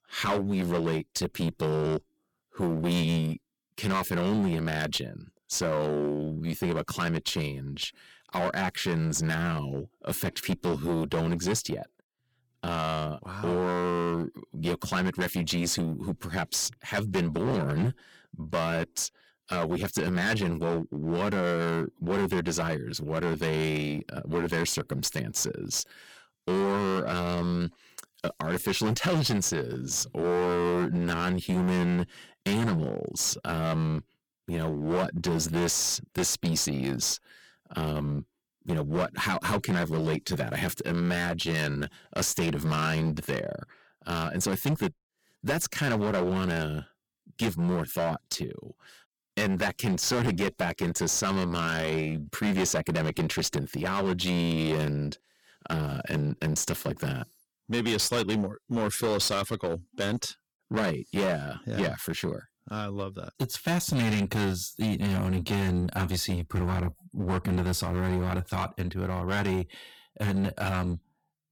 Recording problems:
distortion; heavy; 14% of the sound clipped

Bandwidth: 18.5 kHz